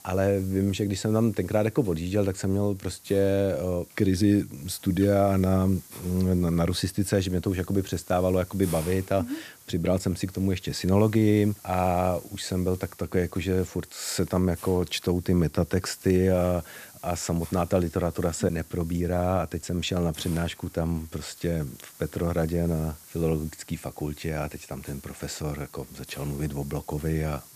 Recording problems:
hiss; noticeable; throughout; 20 dB below the speech

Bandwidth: 14.5 kHz